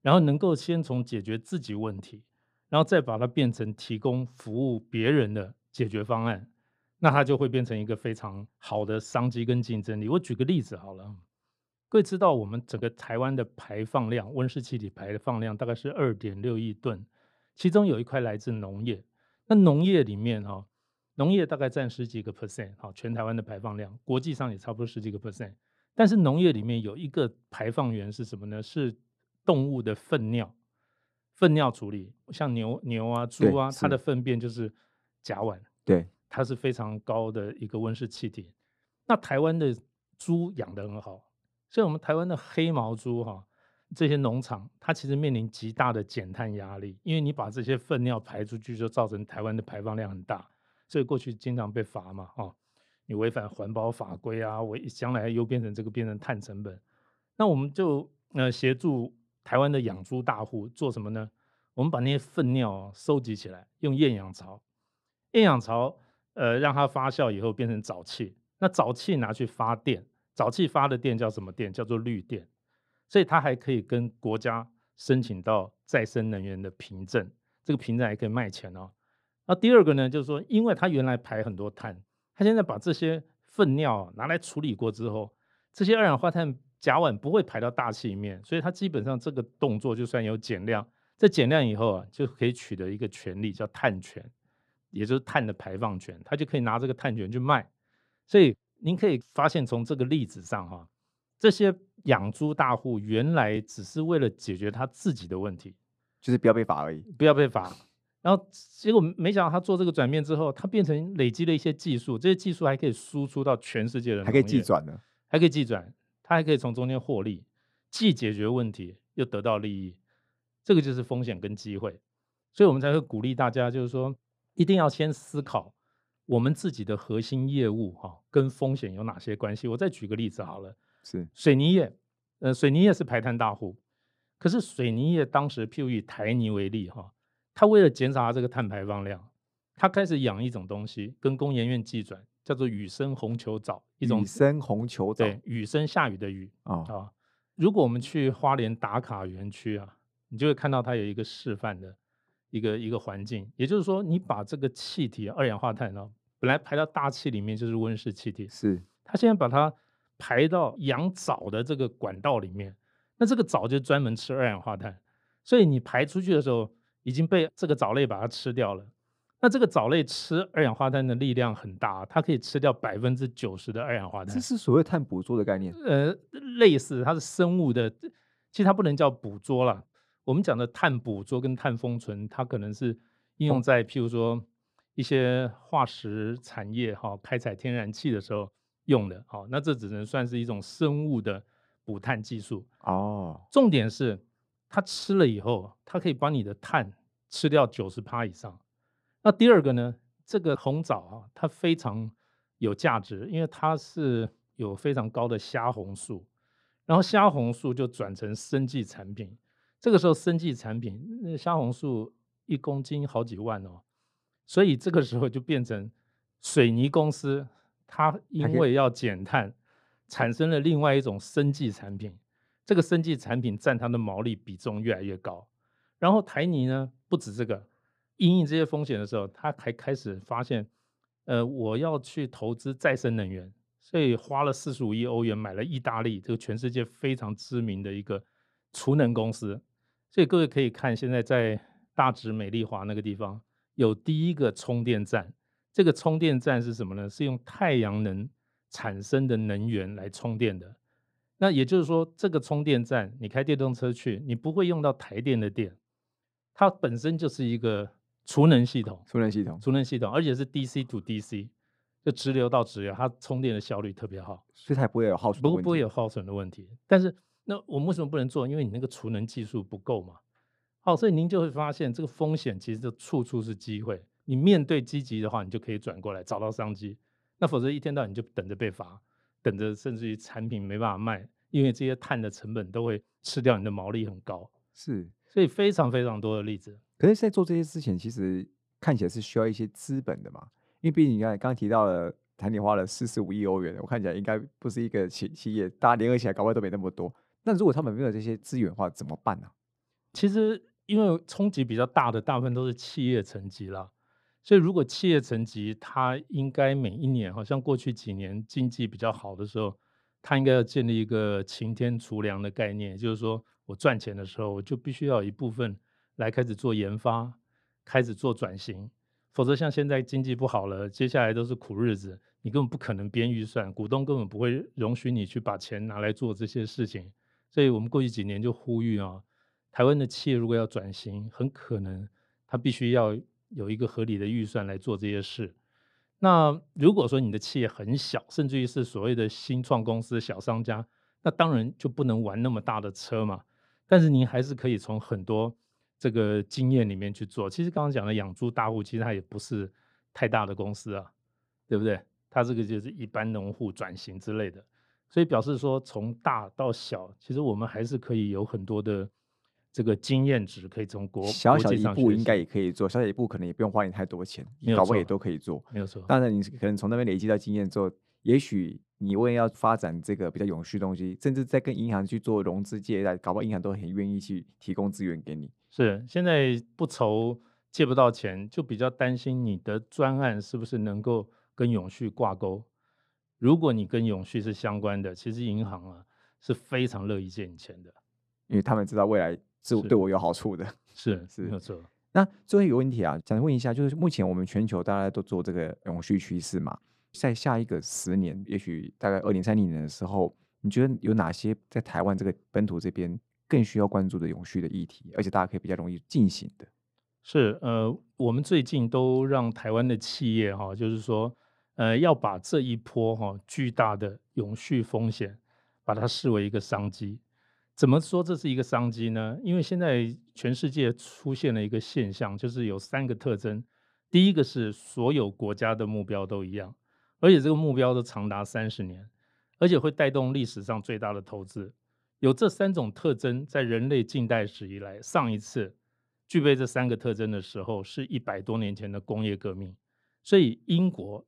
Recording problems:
muffled; slightly; fading above 3 kHz

